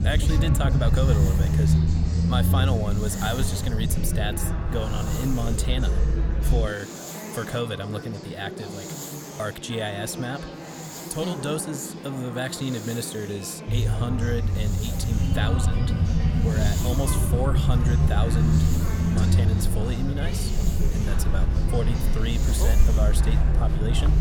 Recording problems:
murmuring crowd; loud; throughout; 6 dB below the speech
hiss; loud; throughout; 10 dB below the speech
low rumble; loud; until 6.5 s and from 14 s on; 5 dB below the speech

